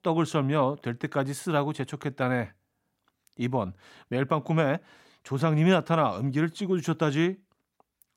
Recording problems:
none

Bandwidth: 16 kHz